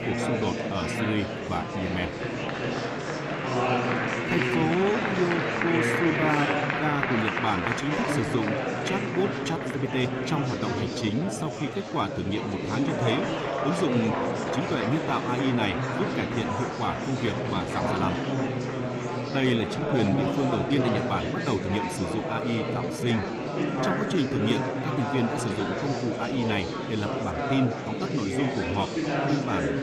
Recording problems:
echo of what is said; faint; from 13 s on; 600 ms later, 20 dB below the speech
murmuring crowd; very loud; throughout; 1 dB above the speech
uneven, jittery; strongly; from 4 to 25 s

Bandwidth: 15 kHz